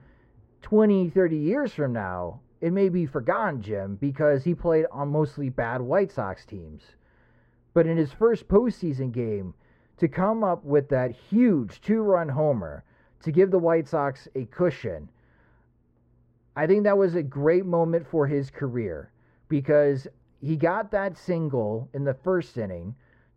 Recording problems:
muffled; very; fading above 3 kHz

